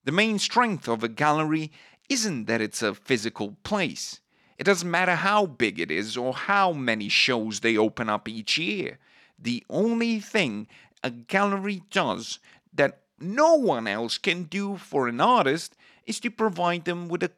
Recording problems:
none

